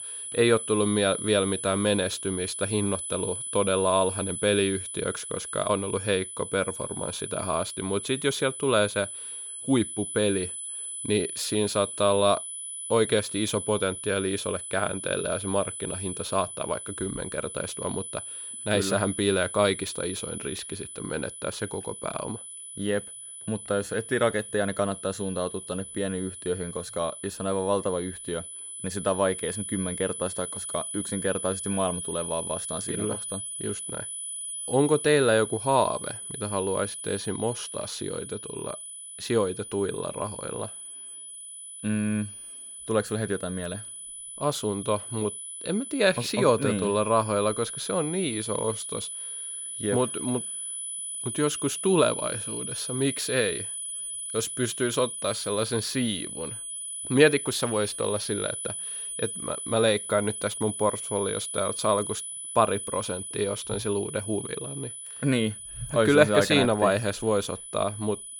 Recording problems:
high-pitched whine; loud; throughout; 10 kHz, 6 dB below the speech

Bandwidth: 18 kHz